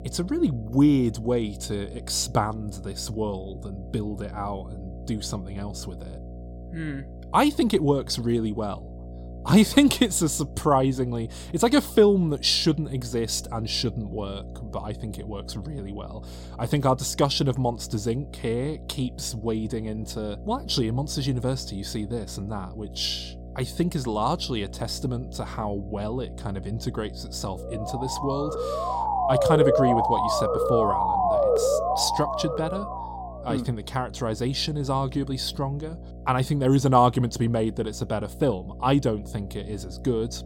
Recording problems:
electrical hum; faint; throughout; 60 Hz, 20 dB below the speech
siren; loud; from 28 to 33 s; peak 6 dB above the speech

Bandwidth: 16.5 kHz